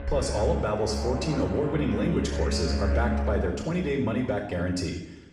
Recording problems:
off-mic speech; far
room echo; noticeable; dies away in 0.8 s
background music; loud; until 3 s; 3 dB below the speech

